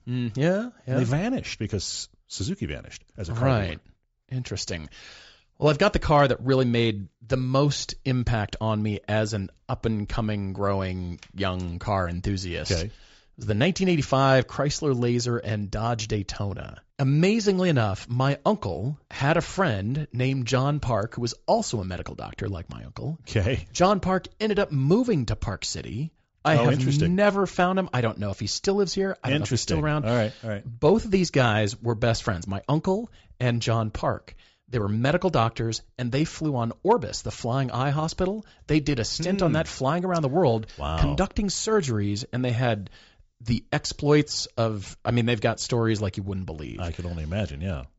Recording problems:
high frequencies cut off; noticeable; nothing above 8 kHz

